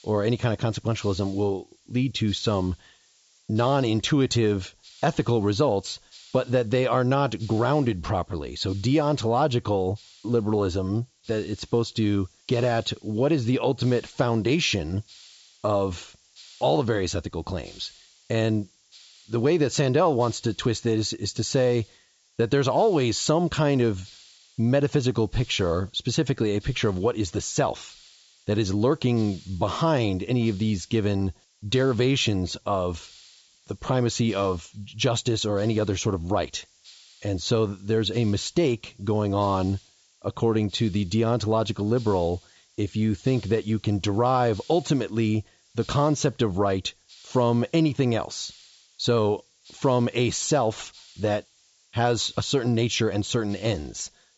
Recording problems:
high frequencies cut off; noticeable; nothing above 8 kHz
hiss; faint; throughout; 25 dB below the speech

